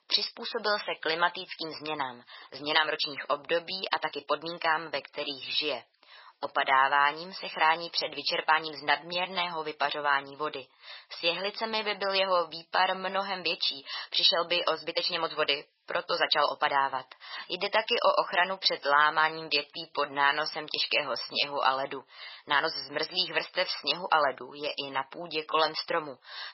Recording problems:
garbled, watery; badly; nothing above 5.5 kHz
thin; very; fading below 750 Hz
uneven, jittery; strongly; from 1 to 26 s

